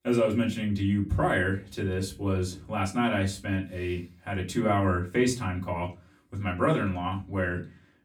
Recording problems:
off-mic speech; far
room echo; very slight; dies away in 0.3 s

